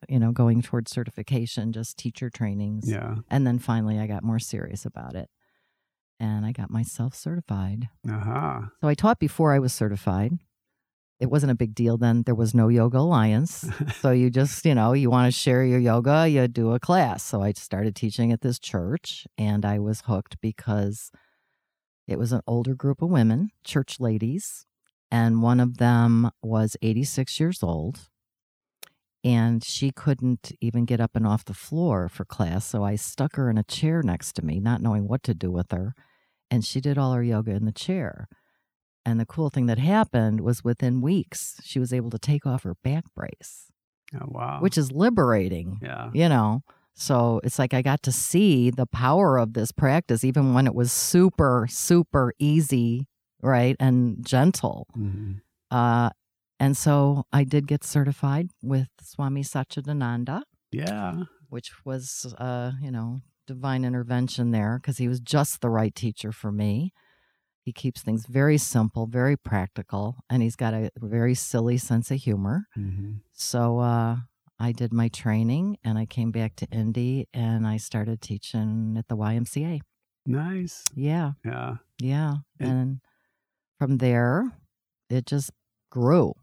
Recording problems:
none

